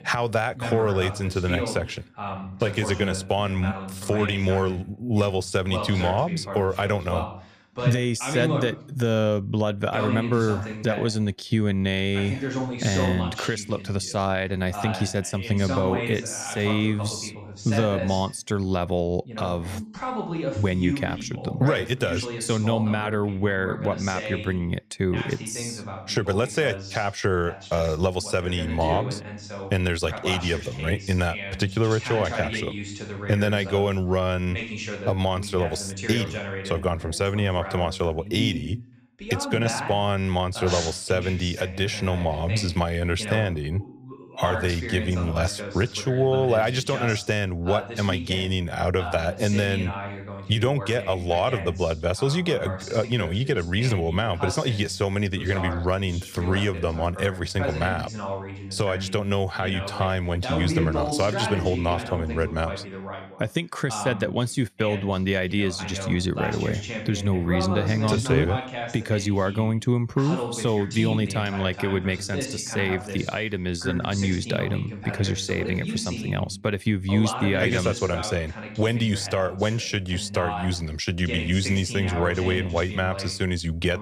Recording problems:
voice in the background; loud; throughout; 8 dB below the speech

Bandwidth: 14.5 kHz